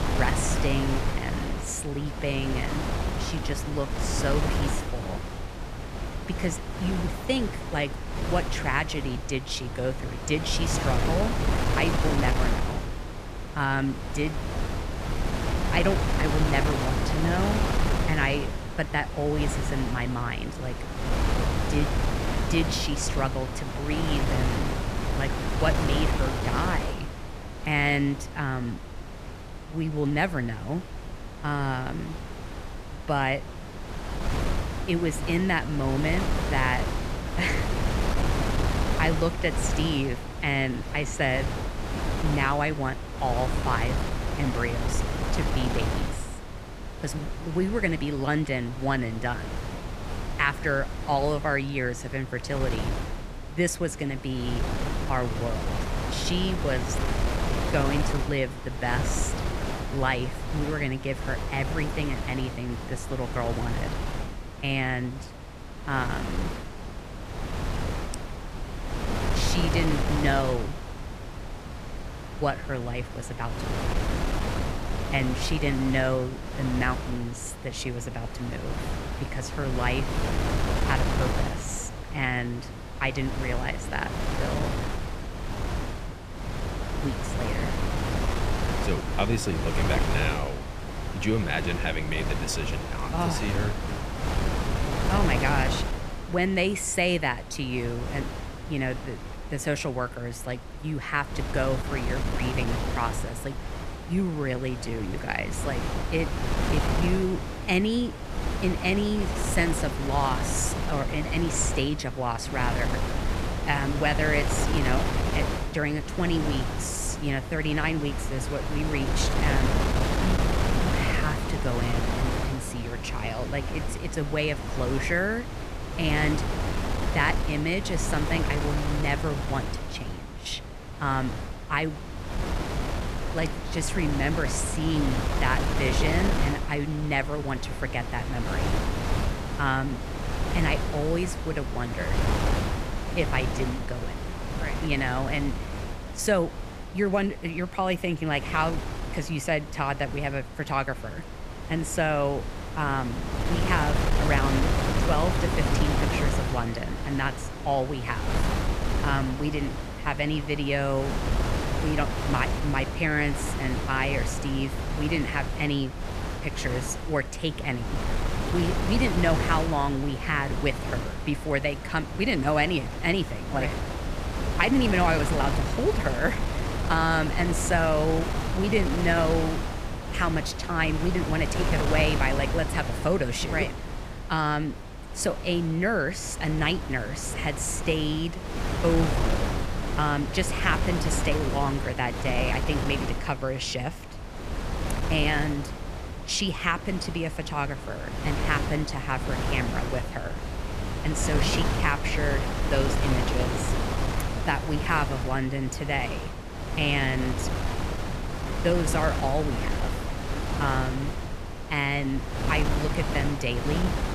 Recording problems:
wind noise on the microphone; heavy; 5 dB below the speech

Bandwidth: 14.5 kHz